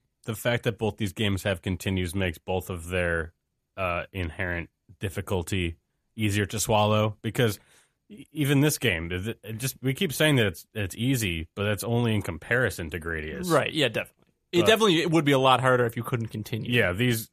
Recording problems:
none

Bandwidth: 14.5 kHz